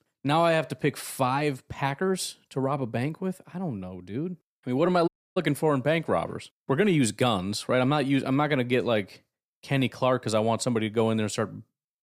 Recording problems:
audio cutting out; at 5 s

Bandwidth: 15 kHz